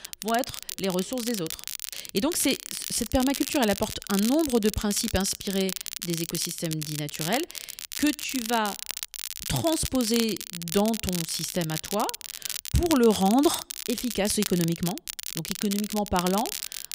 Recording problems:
crackle, like an old record; loud; 6 dB below the speech

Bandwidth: 15.5 kHz